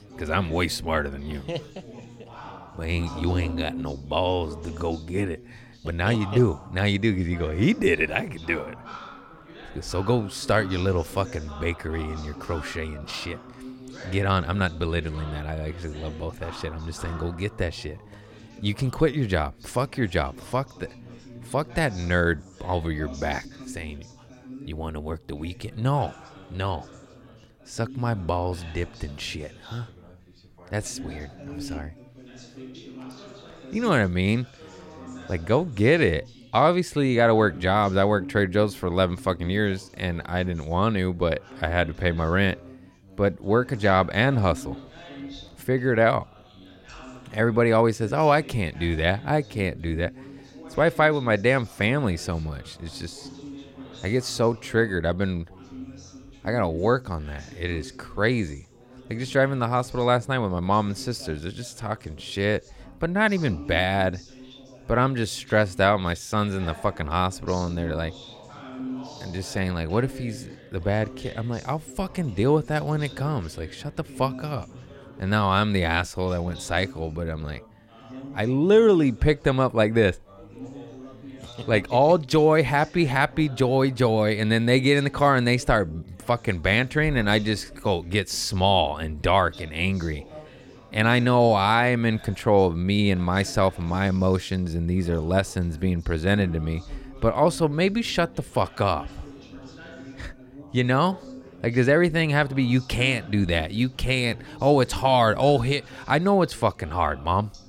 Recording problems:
background chatter; noticeable; throughout; 4 voices, 20 dB below the speech

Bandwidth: 16 kHz